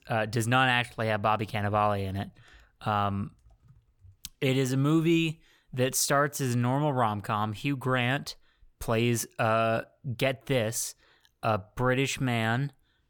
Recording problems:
none

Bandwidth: 18.5 kHz